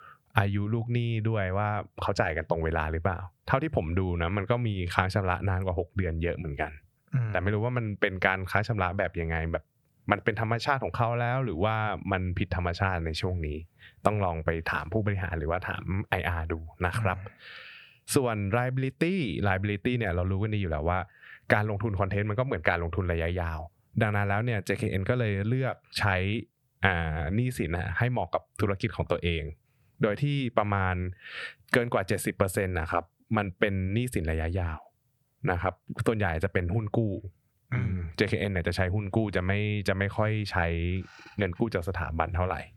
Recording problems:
squashed, flat; somewhat

